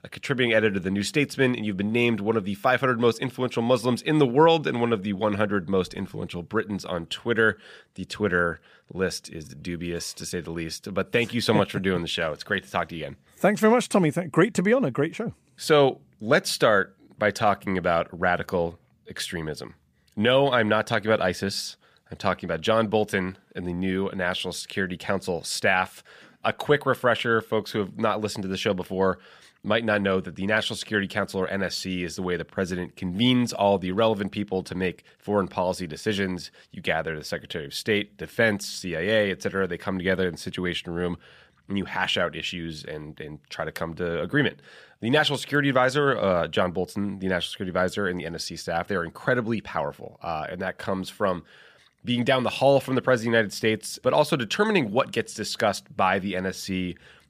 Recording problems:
none

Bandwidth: 15 kHz